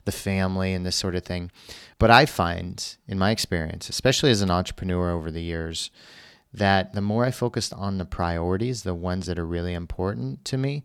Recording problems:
none

